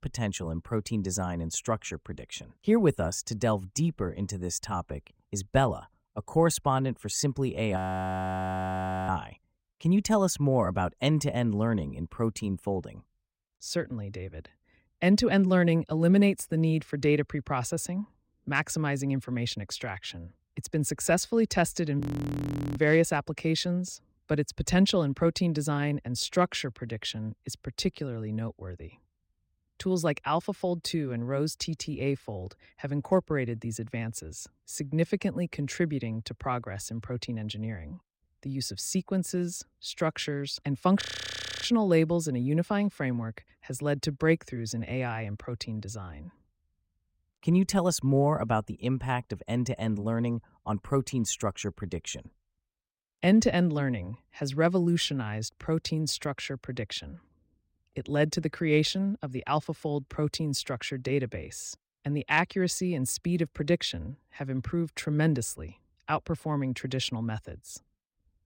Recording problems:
audio freezing; at 8 s for 1.5 s, at 22 s for 1 s and at 41 s for 0.5 s

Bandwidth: 16 kHz